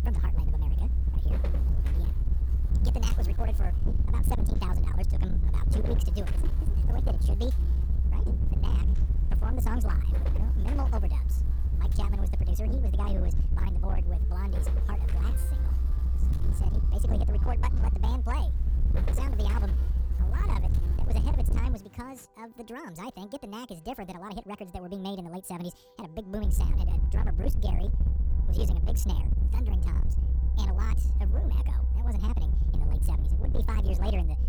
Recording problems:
wrong speed and pitch; too fast and too high; 1.6 times normal speed
distortion; slight; 21% of the sound clipped
electrical hum; loud; until 22 s; 50 Hz, 9 dB below the speech
low rumble; loud; until 22 s and from 26 s on; 4 dB below the speech
background music; faint; from 13 s on; 20 dB below the speech

